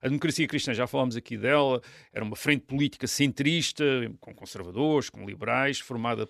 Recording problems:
none

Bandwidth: 14 kHz